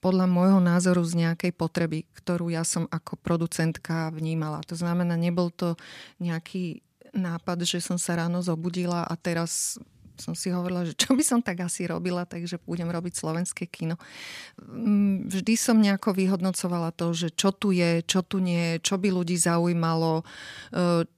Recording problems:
none

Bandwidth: 14.5 kHz